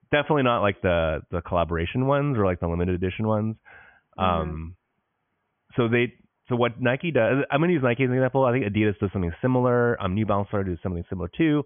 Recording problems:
high frequencies cut off; severe; nothing above 3.5 kHz

